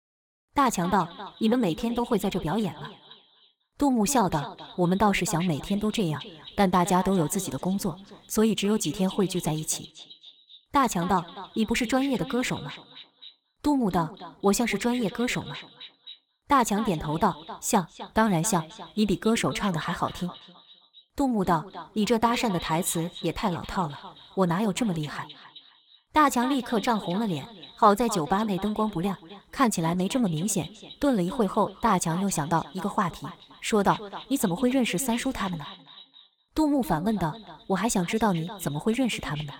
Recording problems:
echo of what is said; noticeable; throughout; 260 ms later, 15 dB below the speech

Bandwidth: 17 kHz